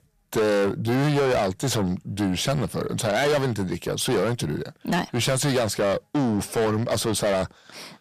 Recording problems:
distortion; heavy; 6 dB below the speech

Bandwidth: 14.5 kHz